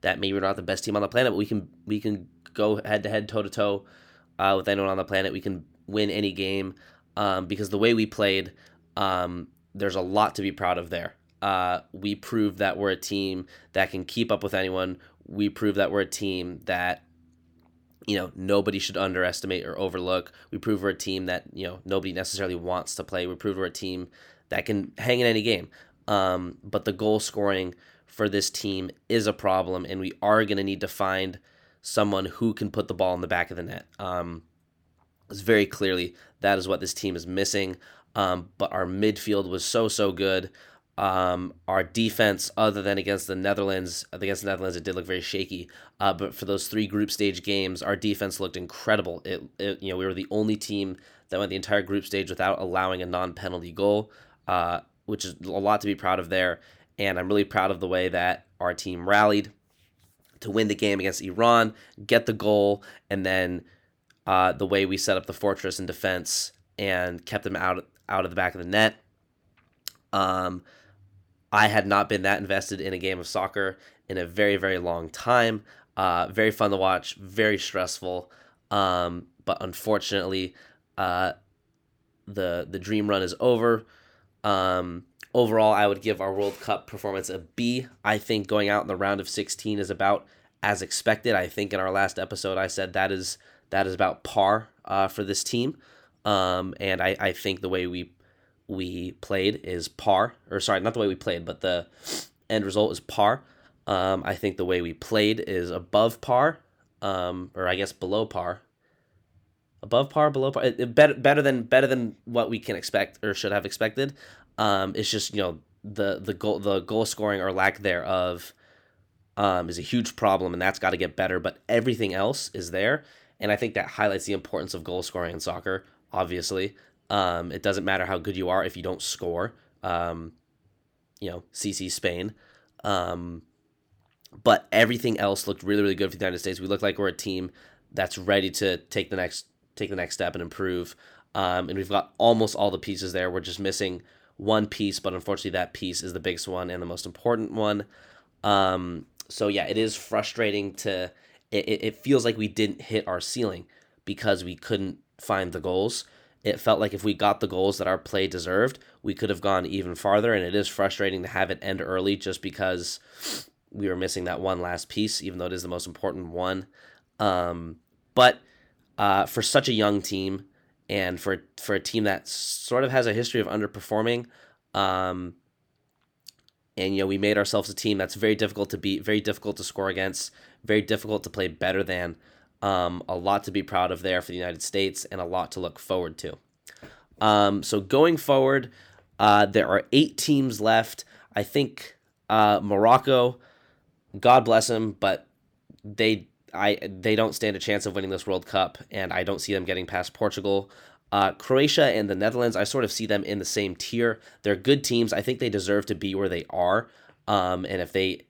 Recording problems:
none

